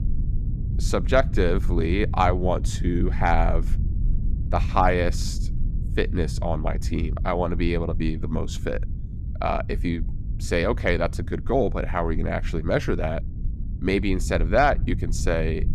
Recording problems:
low rumble; noticeable; throughout; 20 dB below the speech

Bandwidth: 14.5 kHz